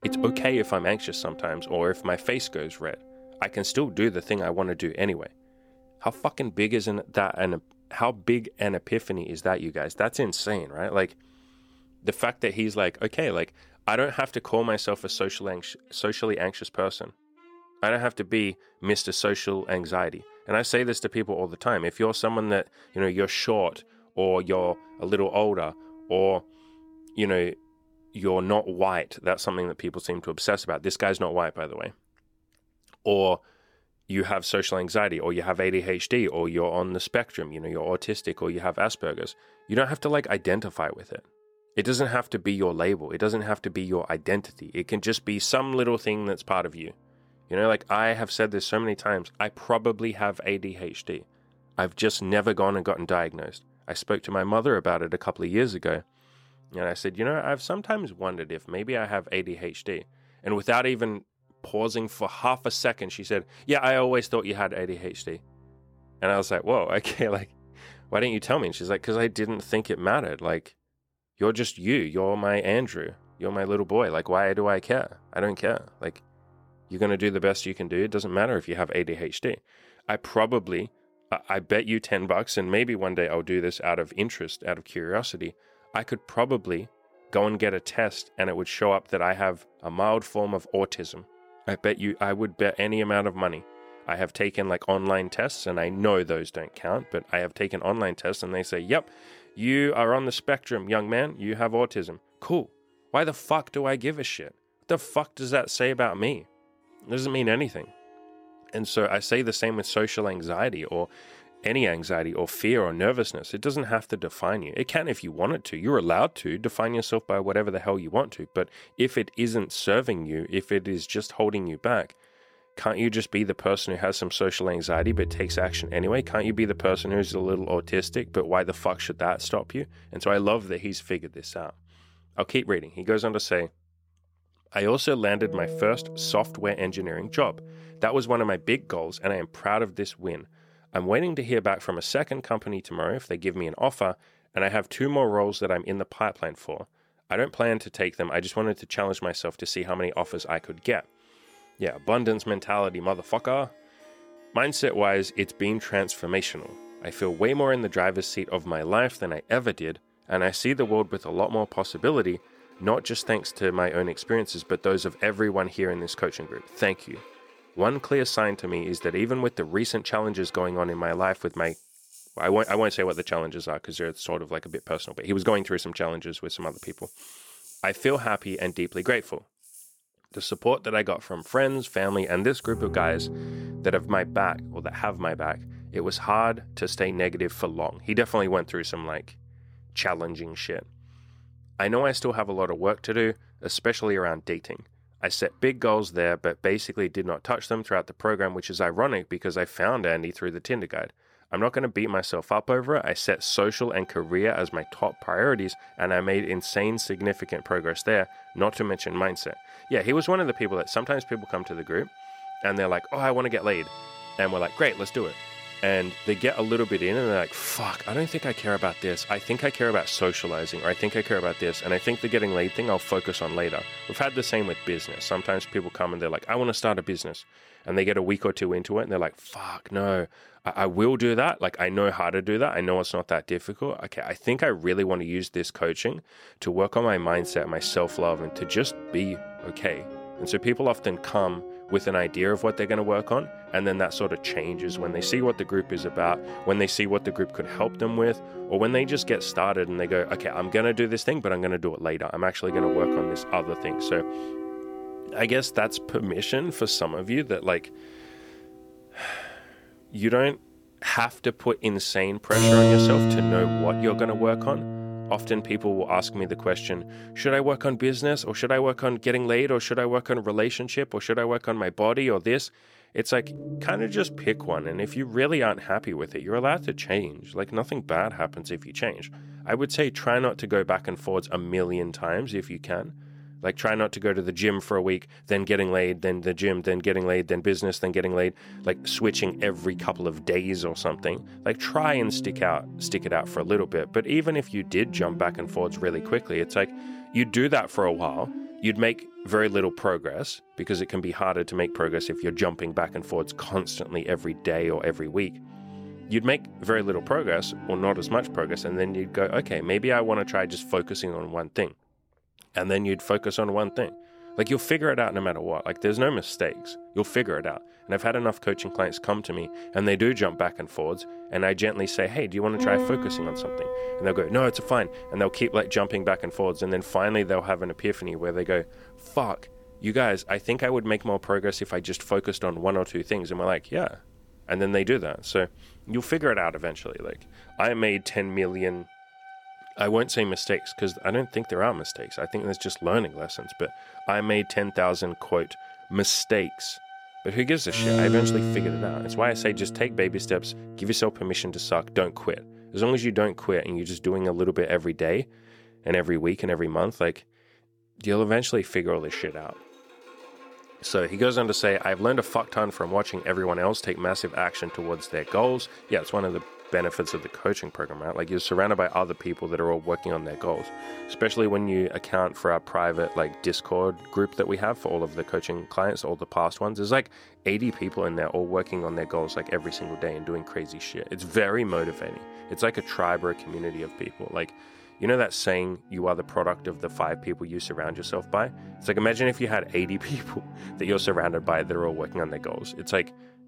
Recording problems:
background music; loud; throughout; 10 dB below the speech

